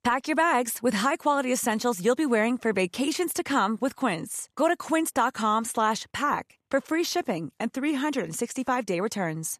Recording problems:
none

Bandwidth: 14 kHz